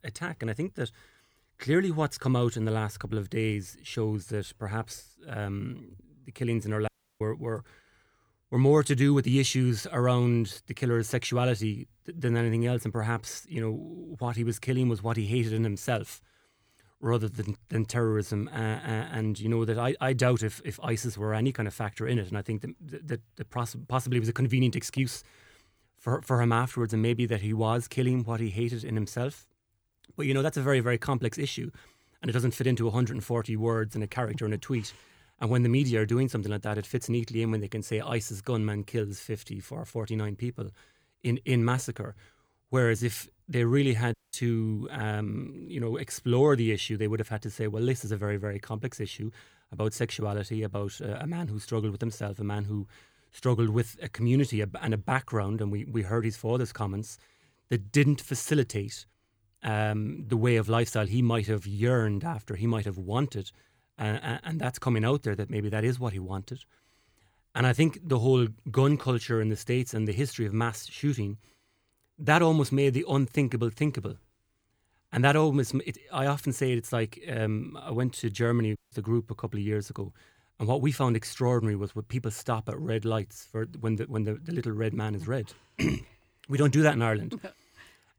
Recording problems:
audio cutting out; at 7 s, at 44 s and at 1:19

